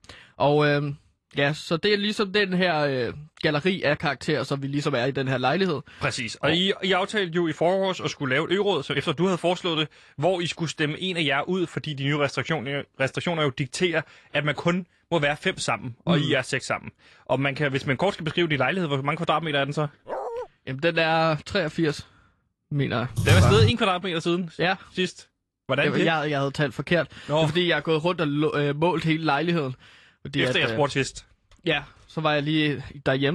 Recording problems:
garbled, watery; slightly
dog barking; noticeable; at 20 s; peak 7 dB below the speech
keyboard typing; loud; at 23 s; peak 5 dB above the speech
abrupt cut into speech; at the end

